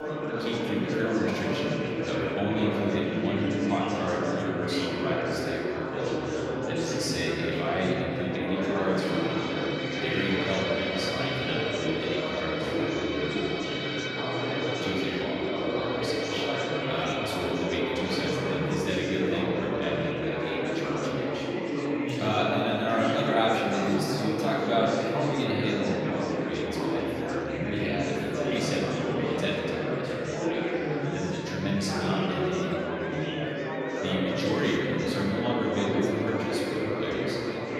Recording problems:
off-mic speech; far
room echo; noticeable; dies away in 2.7 s
chatter from many people; very loud; throughout; 1 dB above the speech
background music; loud; throughout; 8 dB below the speech

